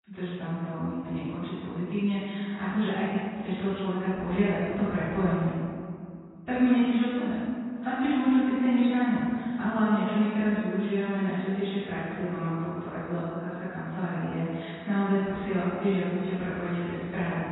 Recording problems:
room echo; strong; dies away in 2.2 s
off-mic speech; far
garbled, watery; badly; nothing above 4 kHz

